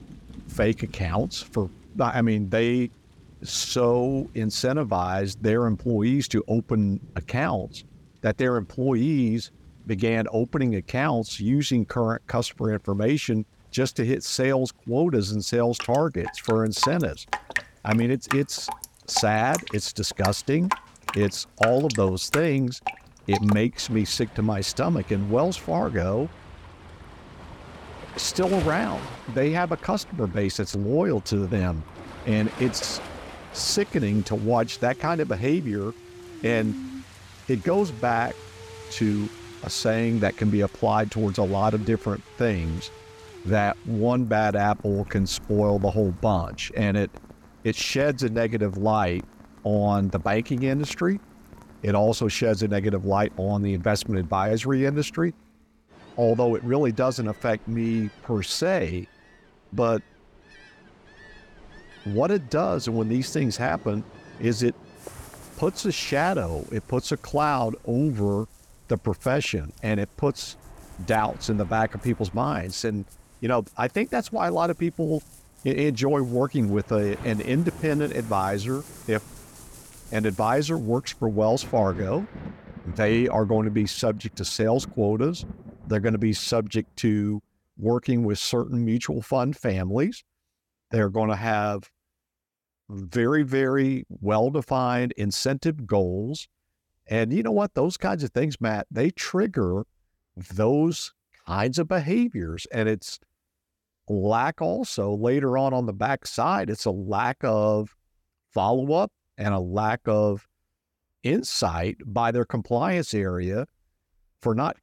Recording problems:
rain or running water; noticeable; until 1:27; 15 dB below the speech

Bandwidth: 17.5 kHz